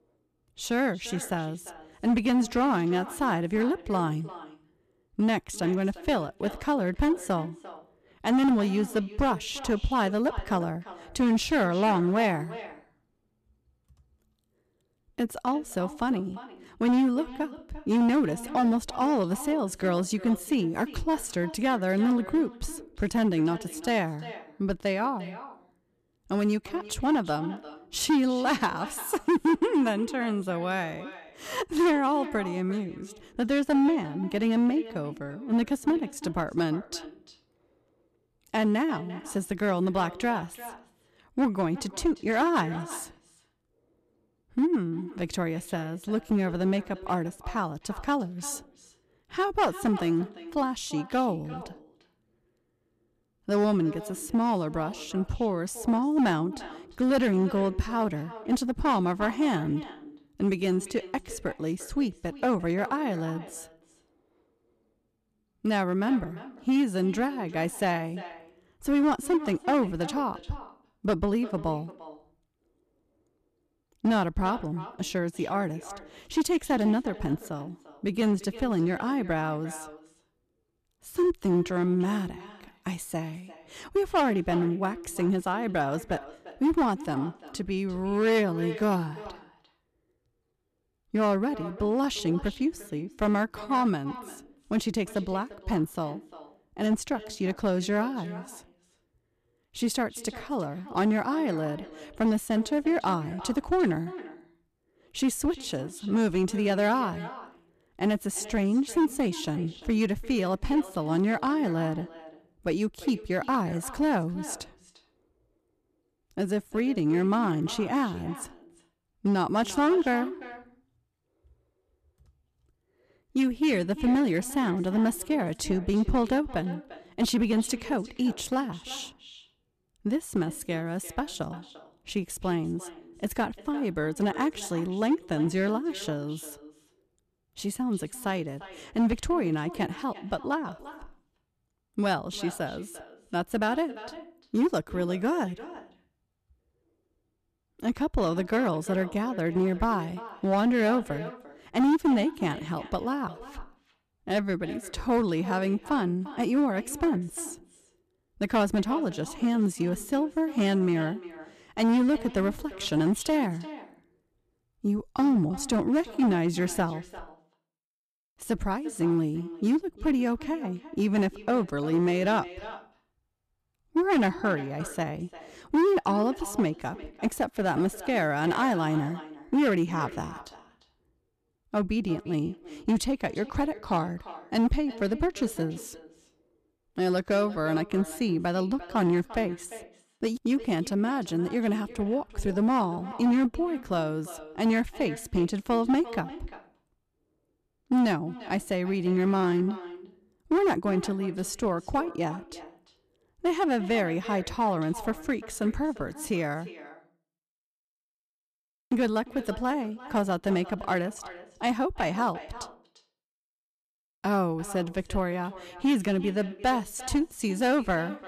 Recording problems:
echo of what is said; noticeable; throughout; 350 ms later, 15 dB below the speech
distortion; slight; 4% of the sound clipped

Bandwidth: 14.5 kHz